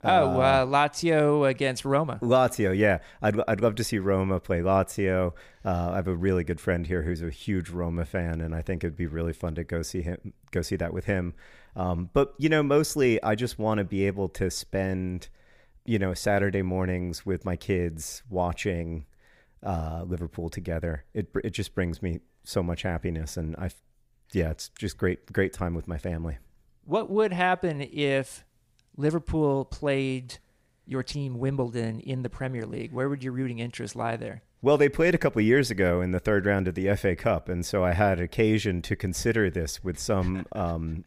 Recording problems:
none

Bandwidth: 15 kHz